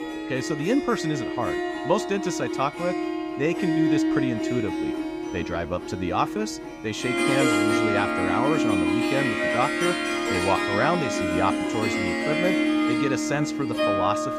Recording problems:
background music; very loud; throughout; 2 dB above the speech

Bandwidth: 15.5 kHz